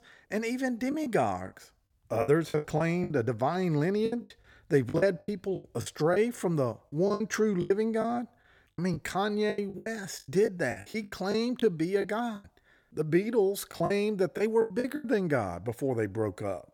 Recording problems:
choppy; very; 13% of the speech affected

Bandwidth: 18 kHz